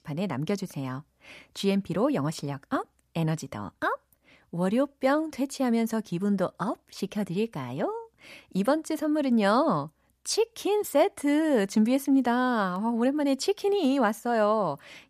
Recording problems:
none

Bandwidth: 14.5 kHz